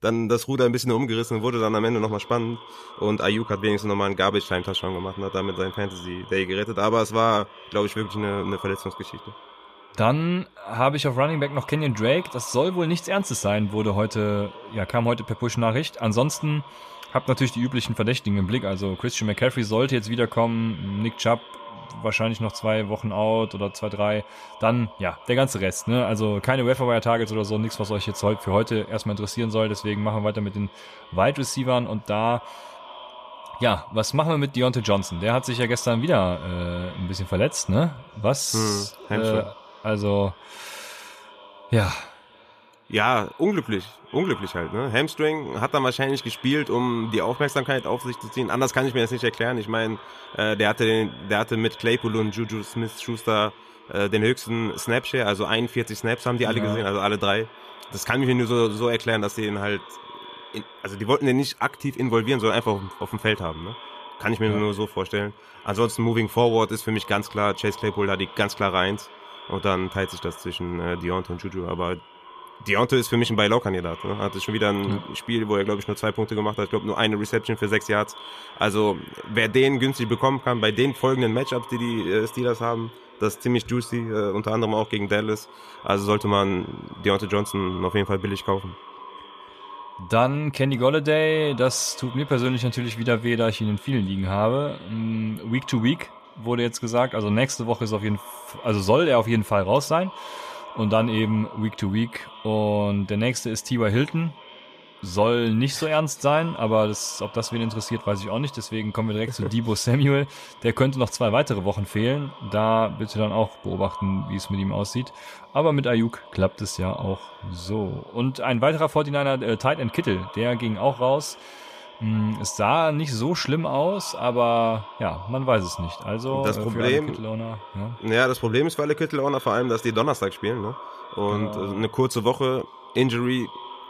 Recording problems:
echo of what is said; noticeable; throughout; 560 ms later, 20 dB below the speech

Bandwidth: 14.5 kHz